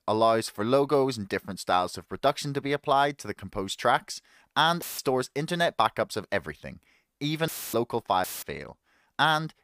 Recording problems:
audio cutting out; filled with static; at 5 s, at 7.5 s and at 8 s

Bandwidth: 15 kHz